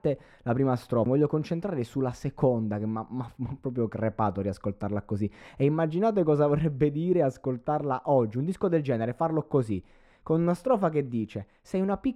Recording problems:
muffled; very; fading above 2.5 kHz

